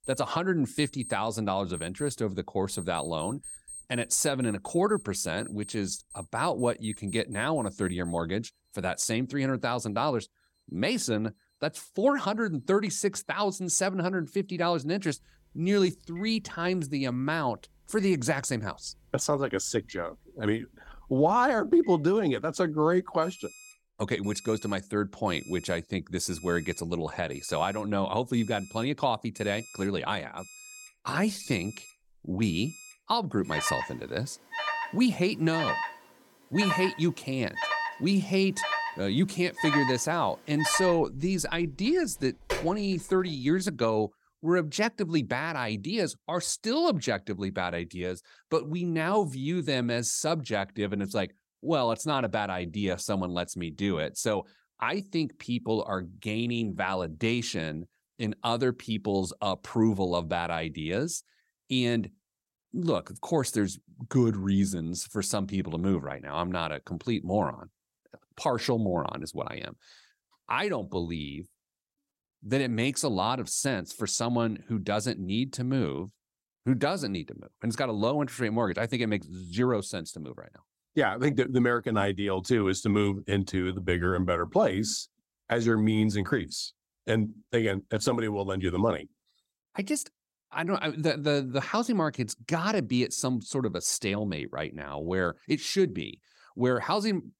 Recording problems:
alarms or sirens; loud; until 44 s; 8 dB below the speech

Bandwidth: 17 kHz